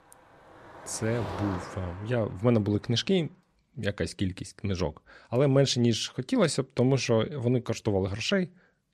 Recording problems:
traffic noise; noticeable; throughout; 15 dB below the speech

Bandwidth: 13.5 kHz